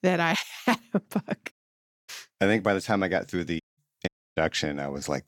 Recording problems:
audio cutting out; at 1.5 s for 0.5 s, at 3.5 s and at 4 s

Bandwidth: 17.5 kHz